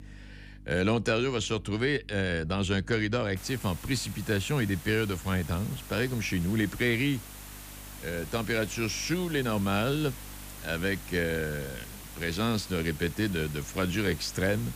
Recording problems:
hiss; noticeable; from 3.5 s on; 15 dB below the speech
electrical hum; faint; throughout; 50 Hz, 30 dB below the speech

